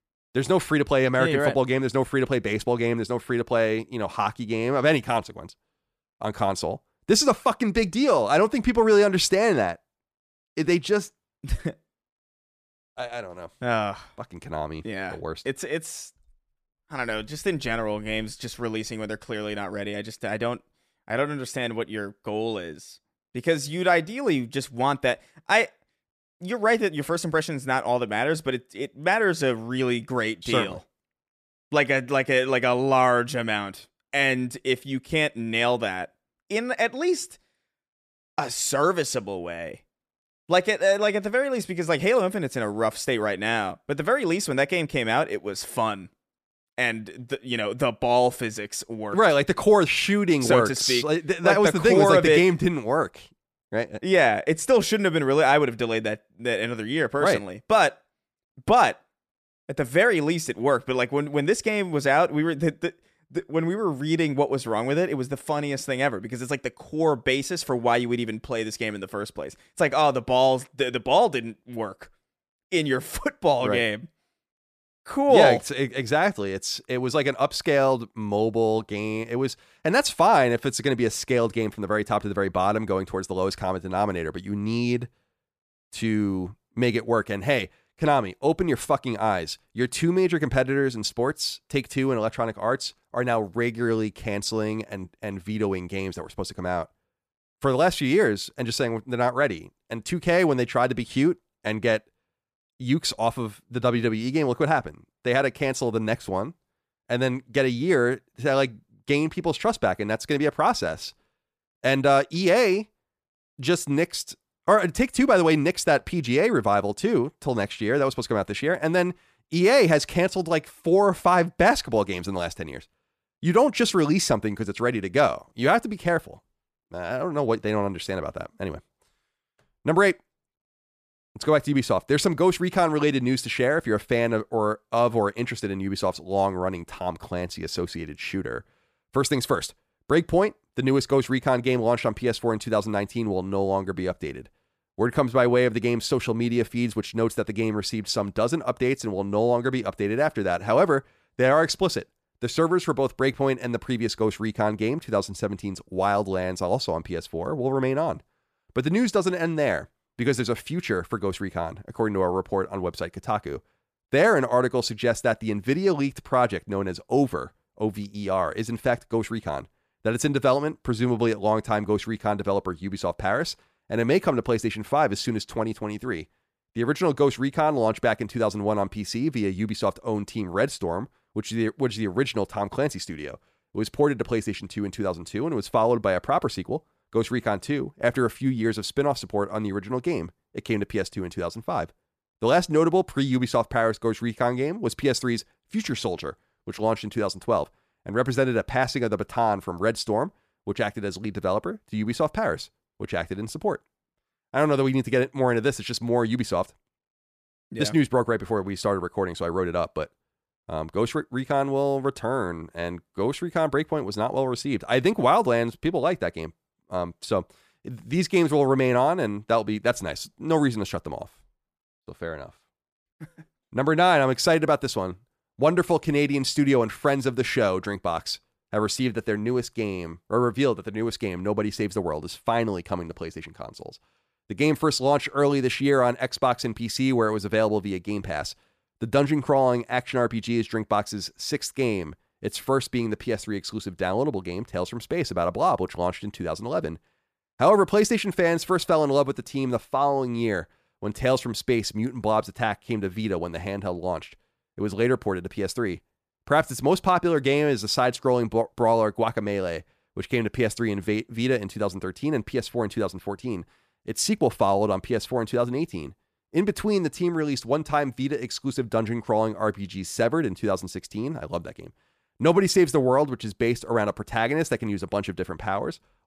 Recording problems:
none

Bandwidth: 14.5 kHz